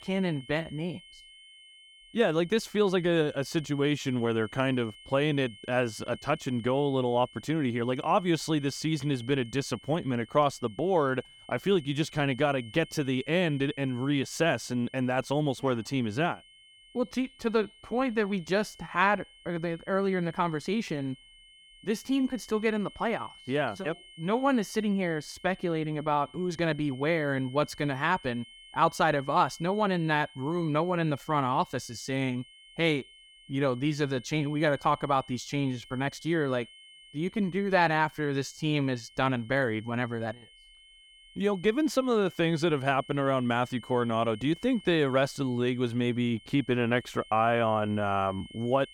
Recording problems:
high-pitched whine; faint; throughout; 3 kHz, 20 dB below the speech

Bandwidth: 18 kHz